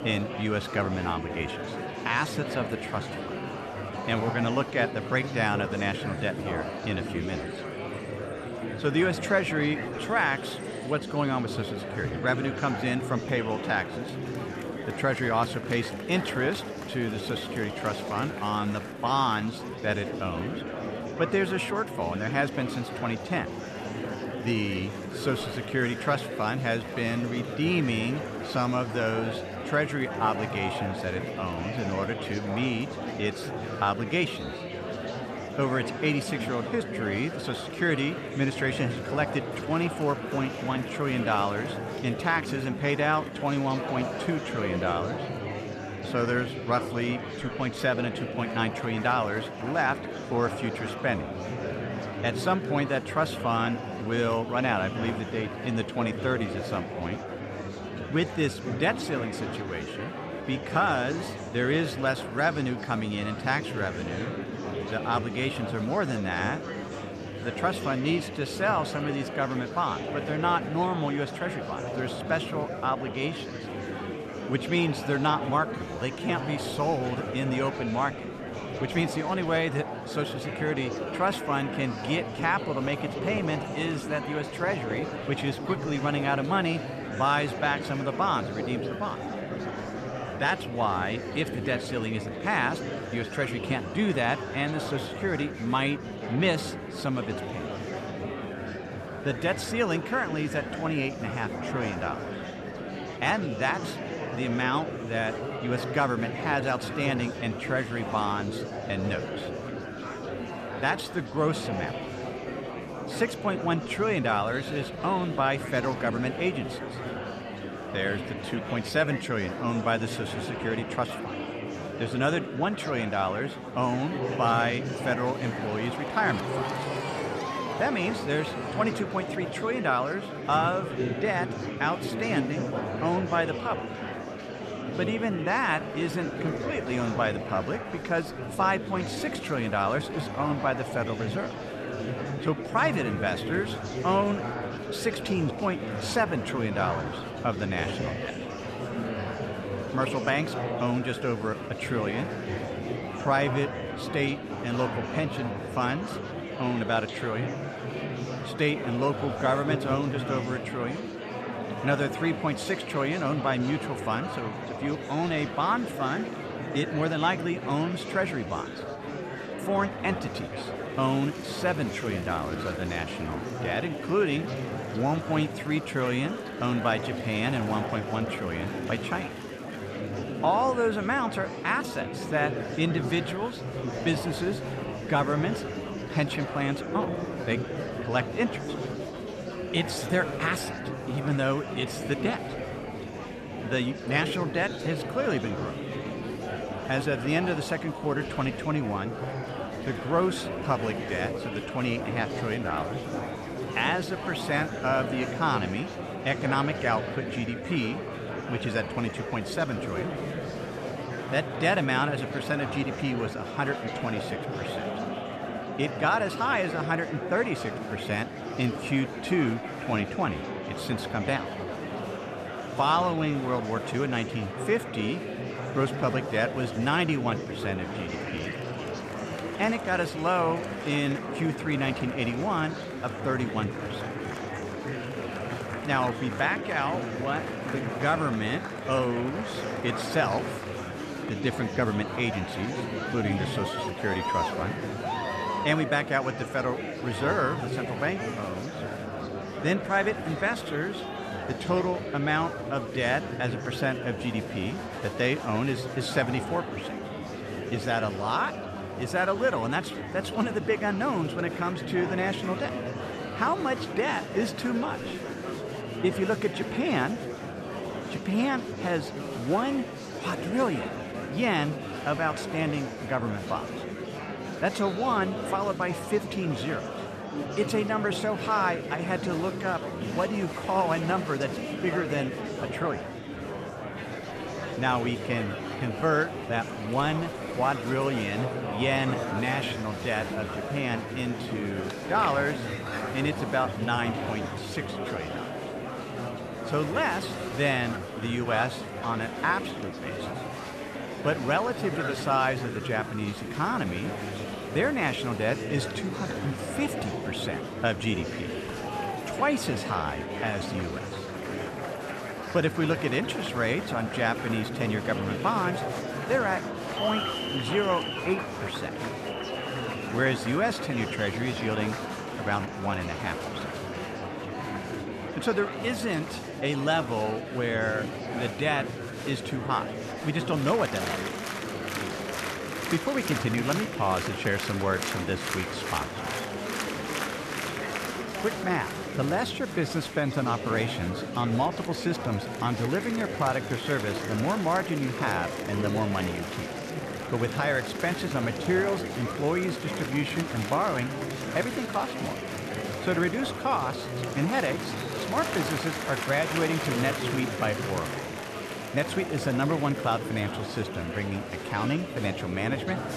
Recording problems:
murmuring crowd; loud; throughout; 5 dB below the speech

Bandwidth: 13.5 kHz